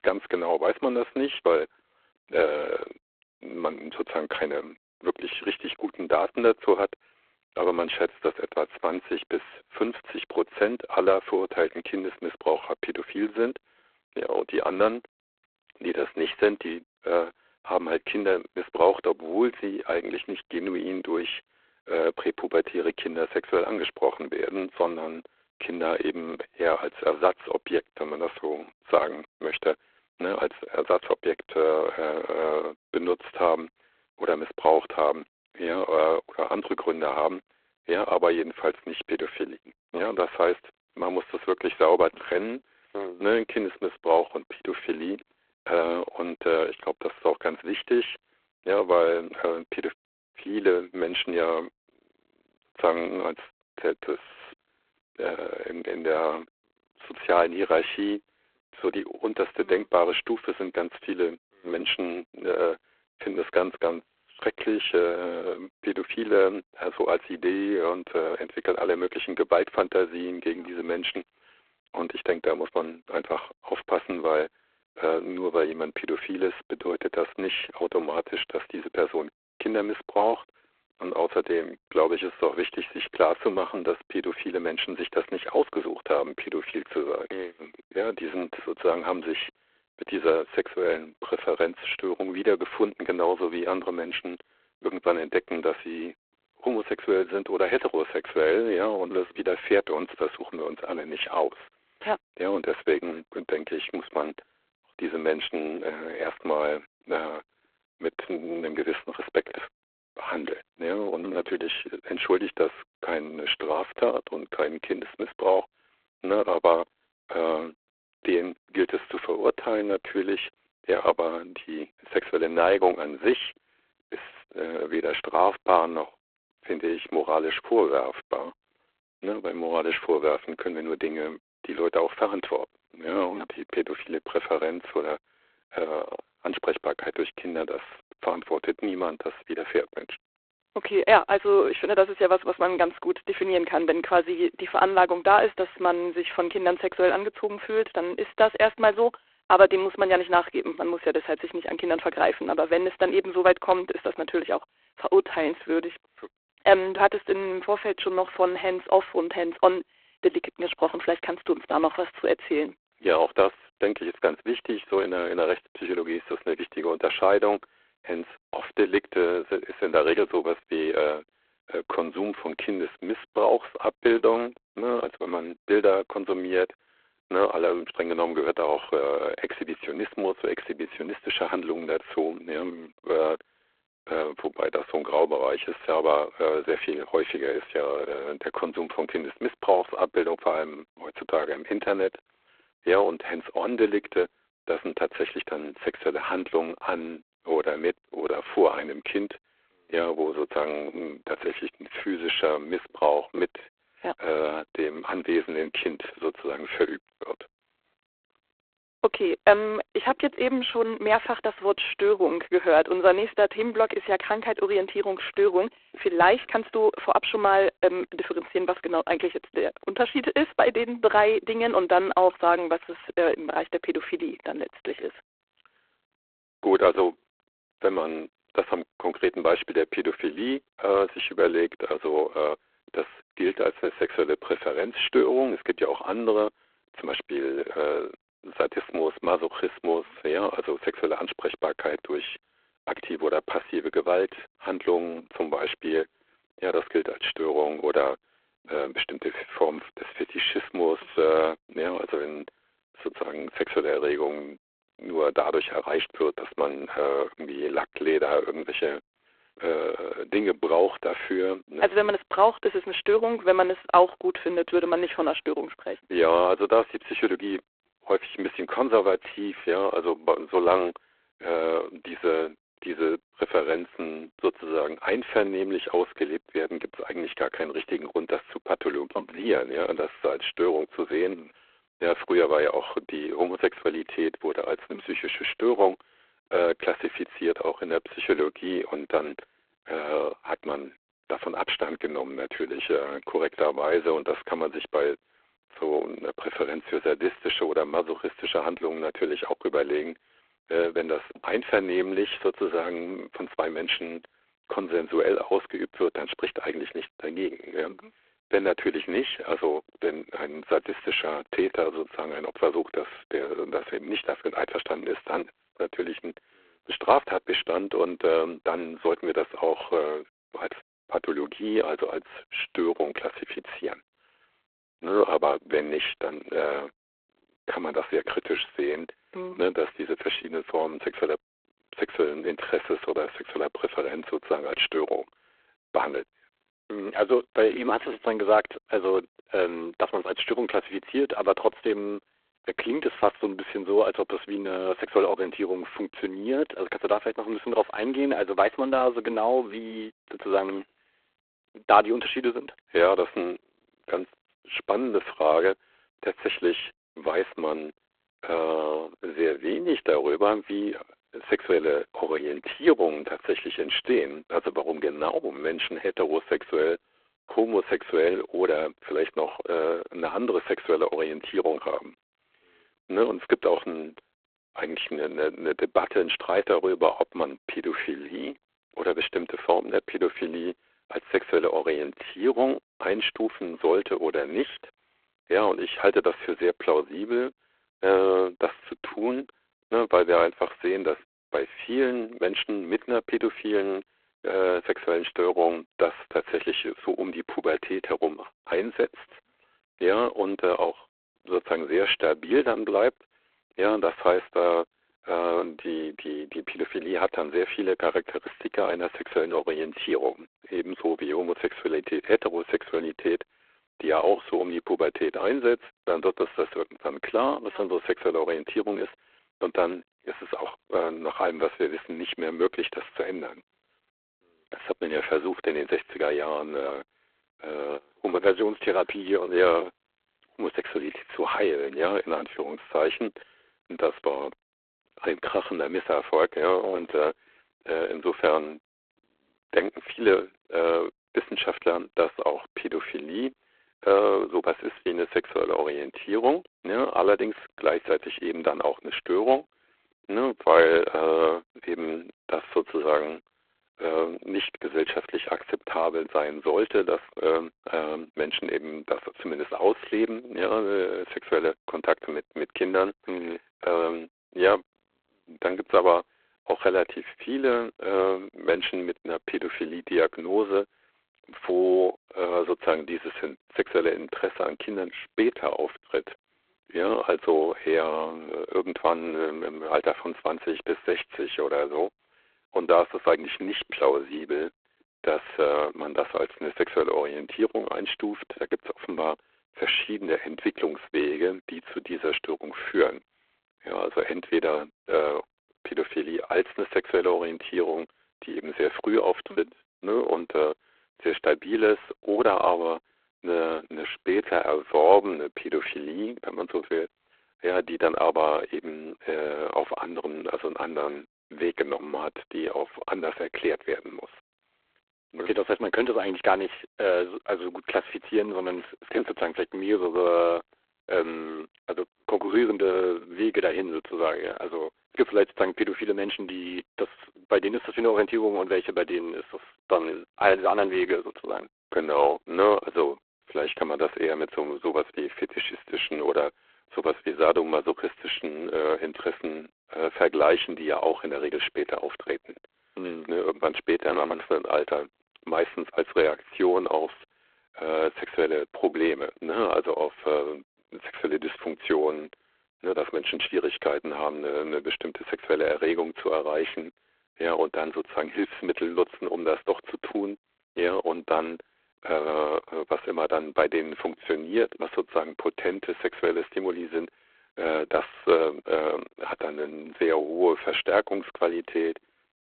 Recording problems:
phone-call audio; poor line

